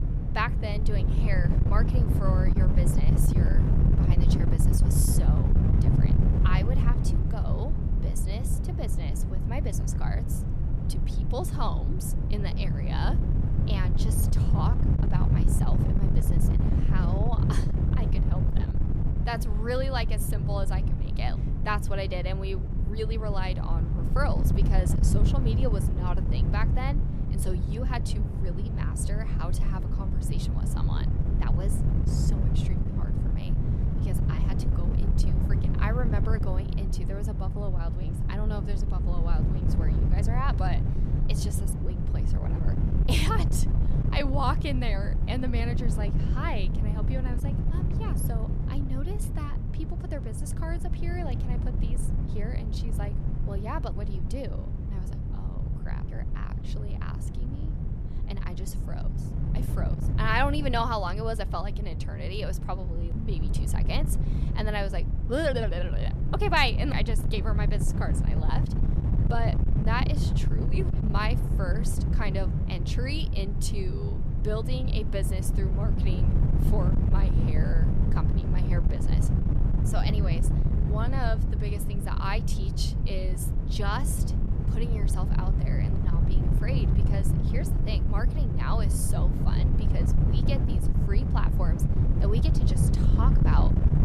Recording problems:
wind noise on the microphone; heavy; 4 dB below the speech

